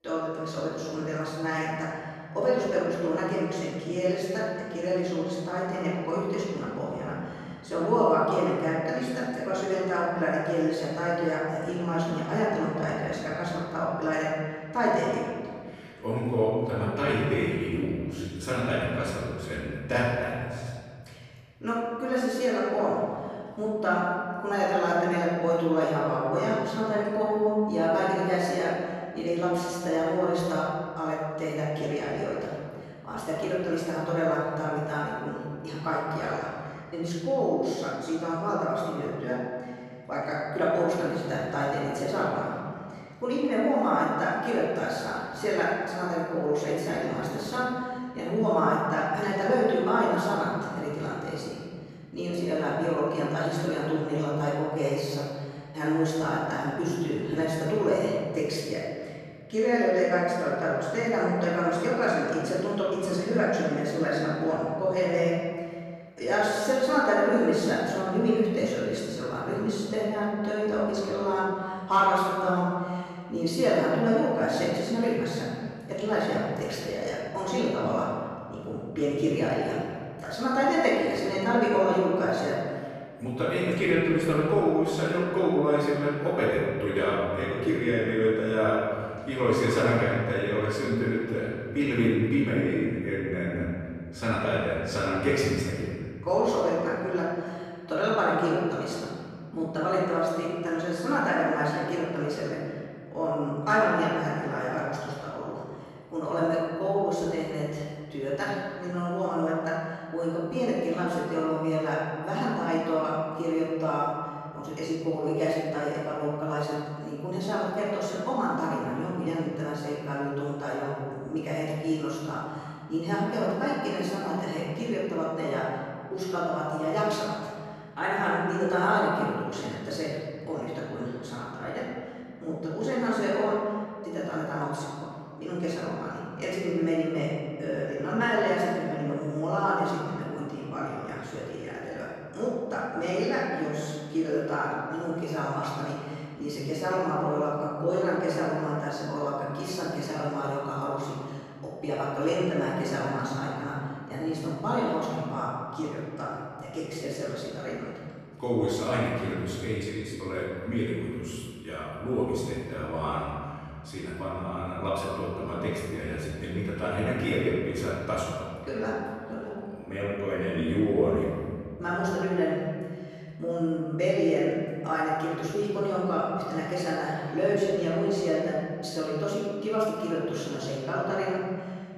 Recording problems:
room echo; strong; dies away in 2.1 s
off-mic speech; far

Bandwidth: 13.5 kHz